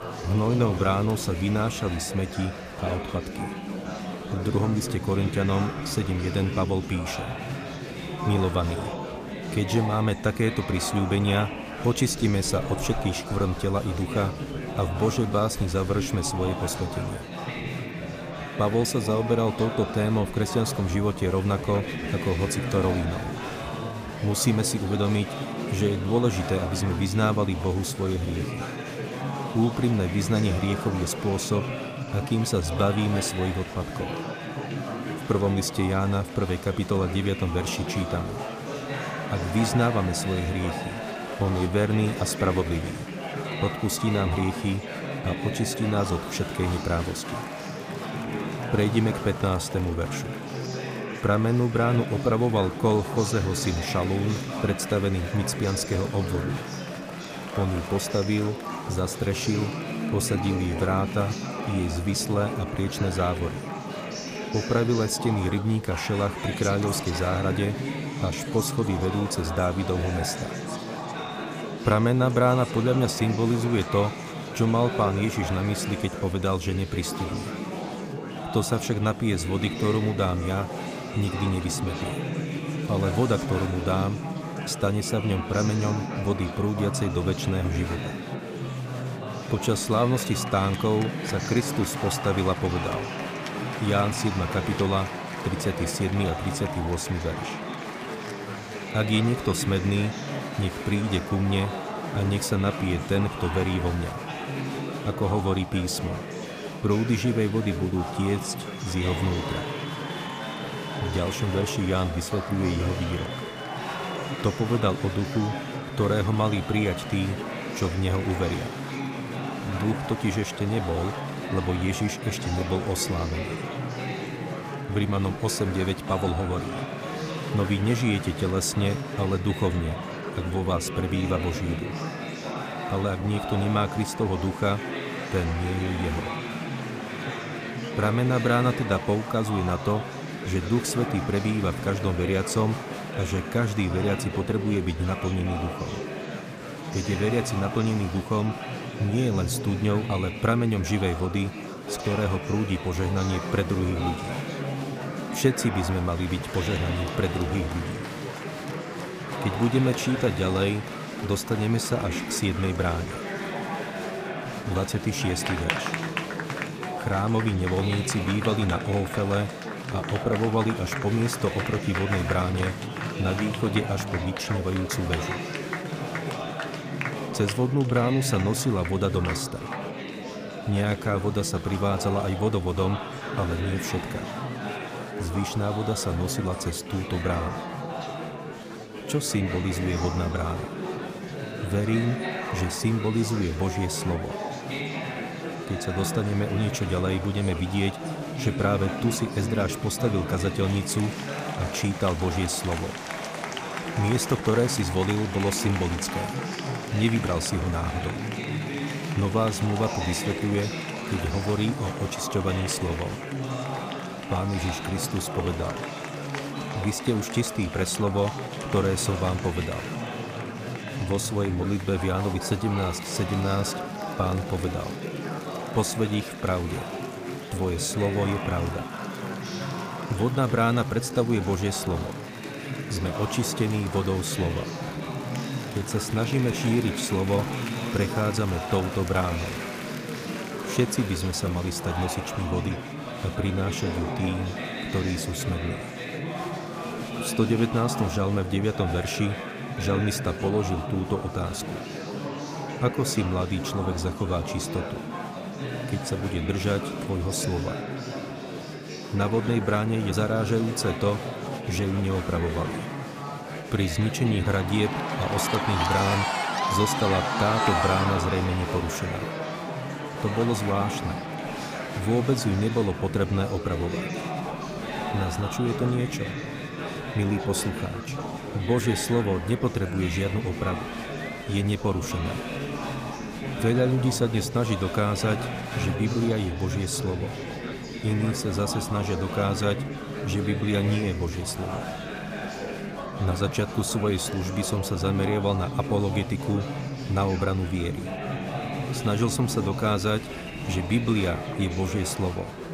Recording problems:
murmuring crowd; loud; throughout; 5 dB below the speech

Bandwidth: 15 kHz